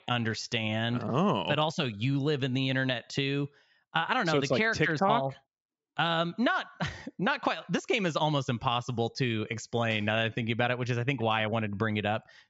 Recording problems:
high frequencies cut off; noticeable; nothing above 8 kHz

